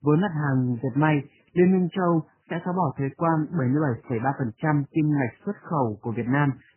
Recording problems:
garbled, watery; badly; nothing above 3 kHz

